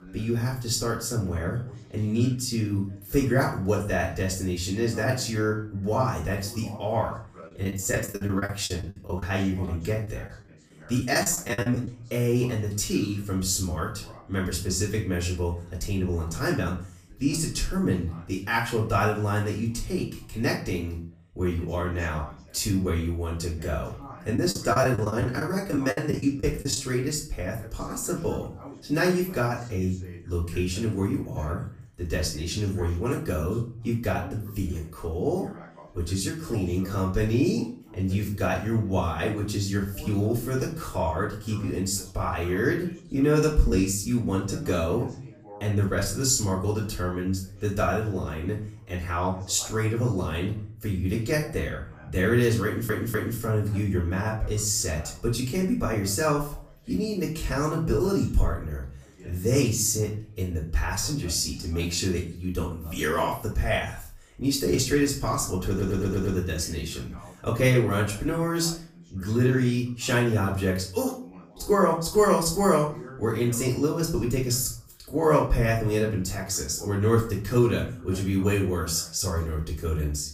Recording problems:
off-mic speech; far
room echo; slight; dies away in 0.4 s
background chatter; faint; throughout; 2 voices, 20 dB below the speech
choppy; very; from 7.5 to 12 s and from 24 to 27 s; 18% of the speech affected
audio stuttering; at 53 s and at 1:06

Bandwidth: 15 kHz